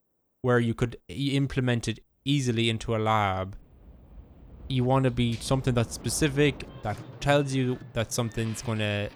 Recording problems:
train or aircraft noise; noticeable; throughout; 20 dB below the speech

